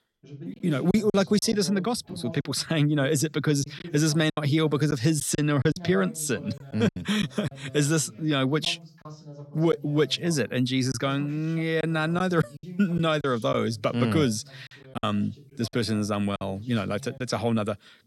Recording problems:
voice in the background; noticeable; throughout; 20 dB below the speech
choppy; very; 5% of the speech affected

